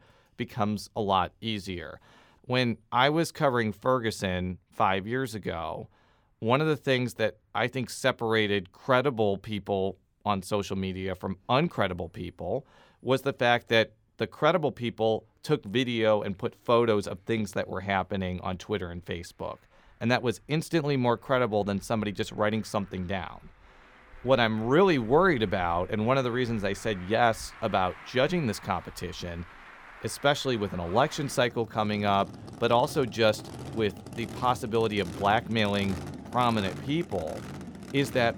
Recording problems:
traffic noise; noticeable; throughout; 15 dB below the speech

